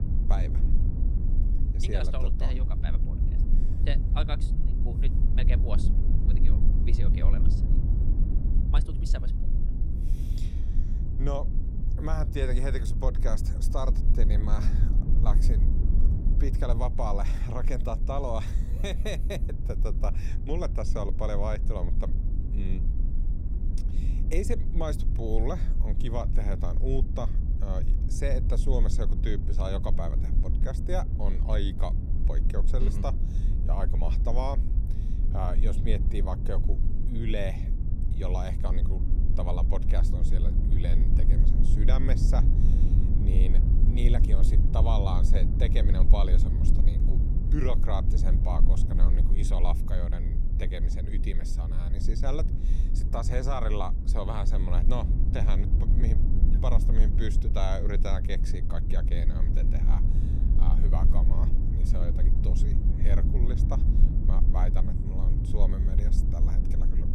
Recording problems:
low rumble; loud; throughout; 6 dB below the speech

